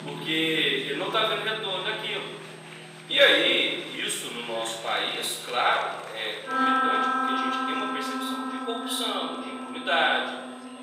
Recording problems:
off-mic speech; far
room echo; noticeable; dies away in 1.2 s
thin; somewhat; fading below 600 Hz
background music; loud; throughout; 3 dB below the speech
chatter from many people; noticeable; throughout; 20 dB below the speech
high-pitched whine; faint; throughout; 8.5 kHz, 30 dB below the speech

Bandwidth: 15.5 kHz